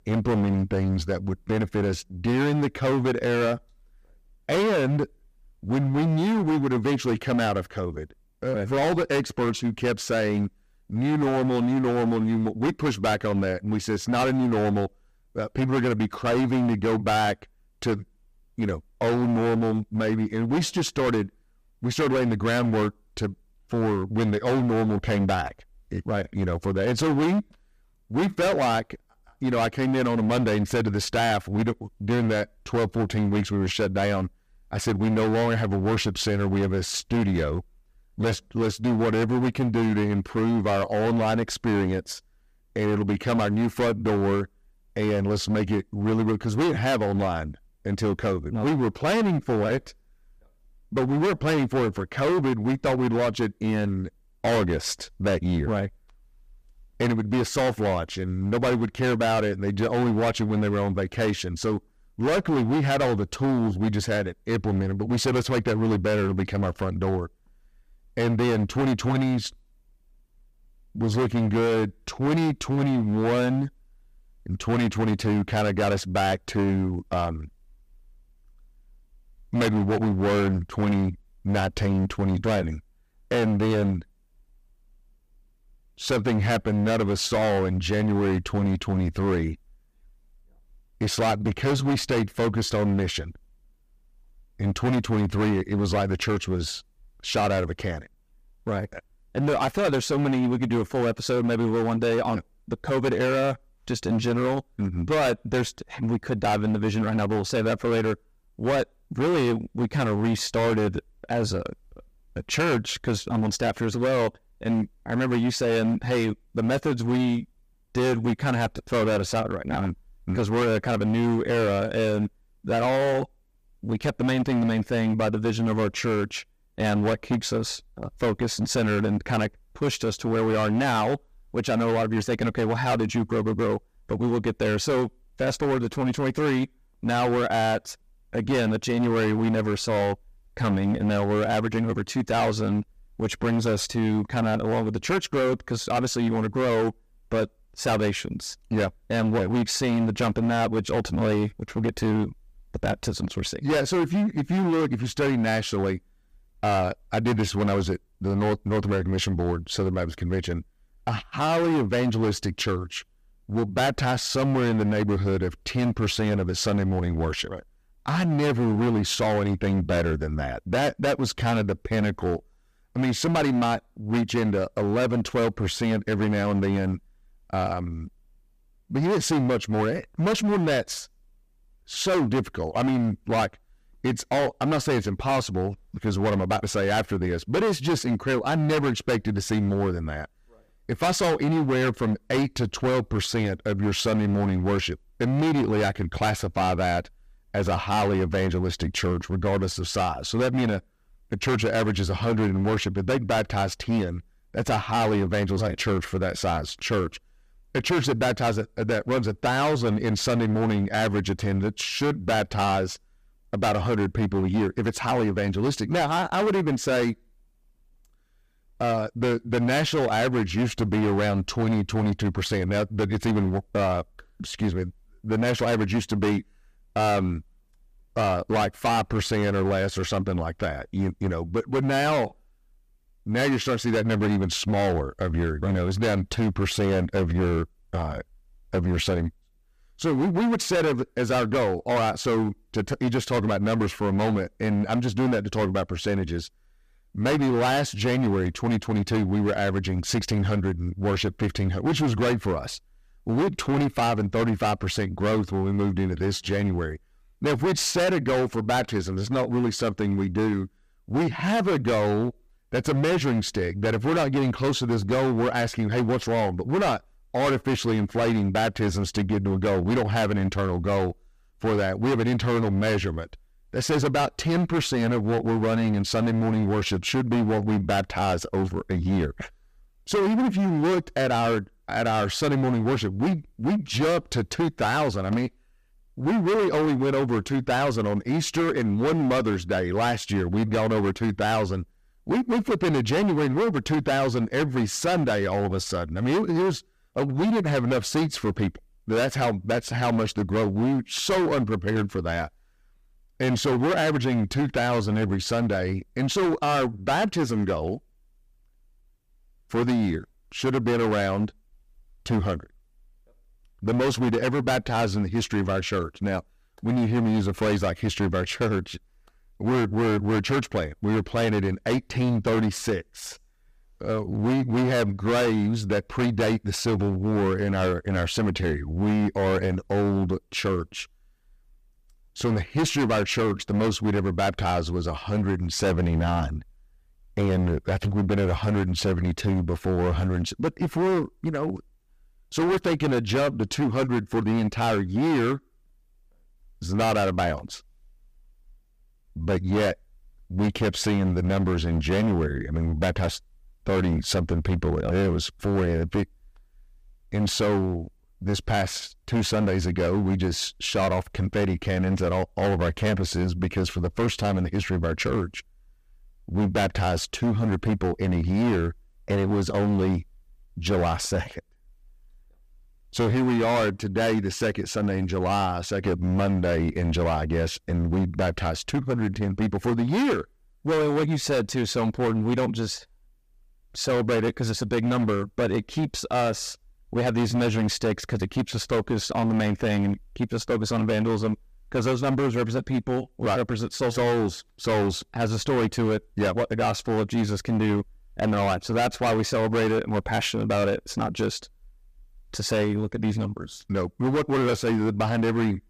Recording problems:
distortion; heavy; 18% of the sound clipped

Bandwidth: 15 kHz